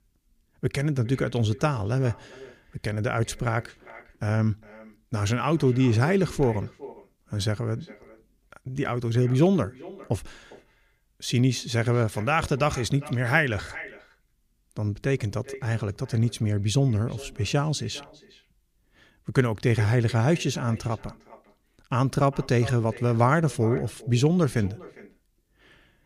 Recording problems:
echo of what is said; faint; throughout; 400 ms later, 20 dB below the speech

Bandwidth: 15 kHz